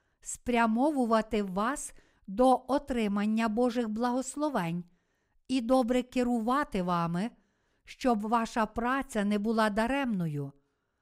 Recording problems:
none

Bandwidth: 15.5 kHz